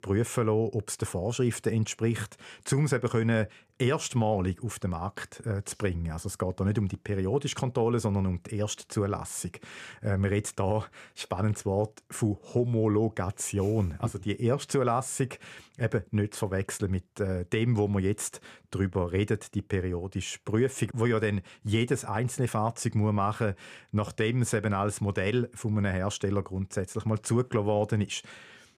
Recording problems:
none

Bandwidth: 14.5 kHz